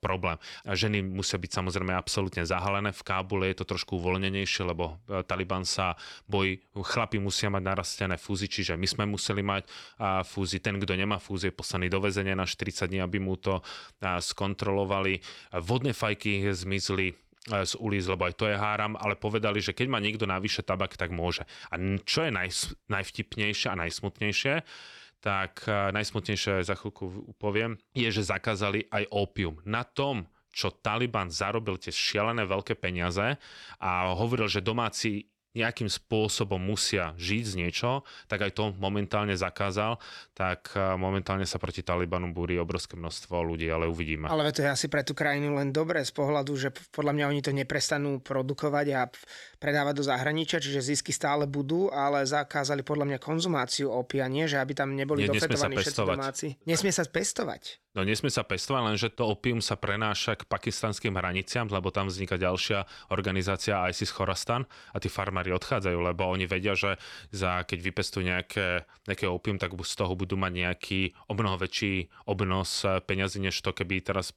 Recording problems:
none

